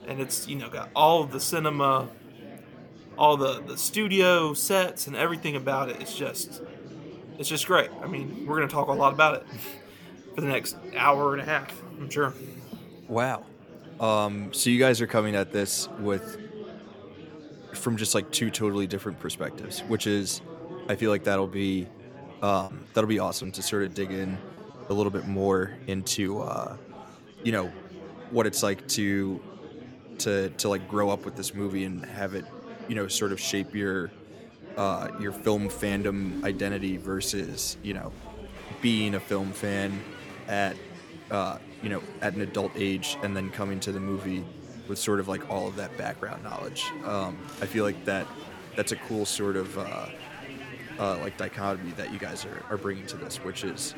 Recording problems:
murmuring crowd; noticeable; throughout; 15 dB below the speech
choppy; occasionally; from 23 to 25 s; 2% of the speech affected

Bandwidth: 17.5 kHz